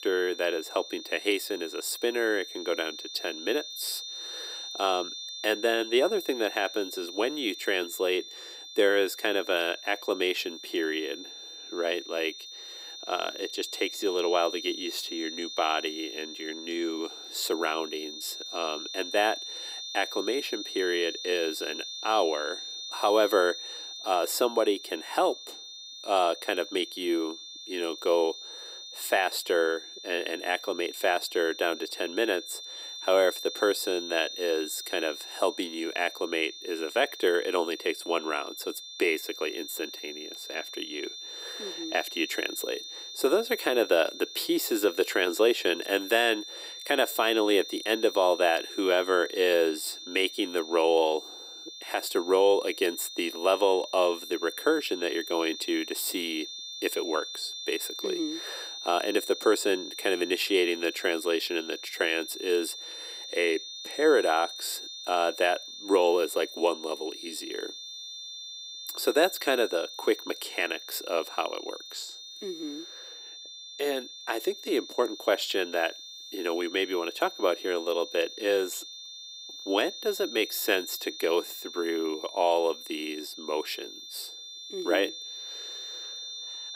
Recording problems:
thin; very; fading below 350 Hz
high-pitched whine; noticeable; throughout; 3.5 kHz, 10 dB below the speech

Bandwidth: 15.5 kHz